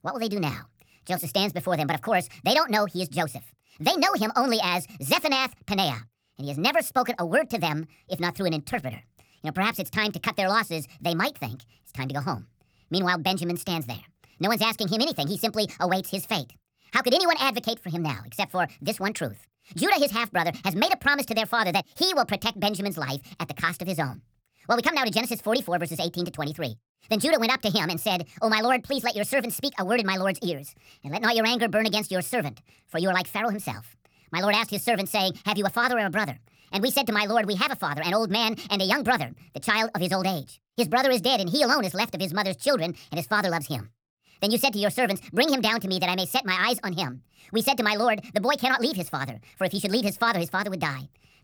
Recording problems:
wrong speed and pitch; too fast and too high; 1.5 times normal speed

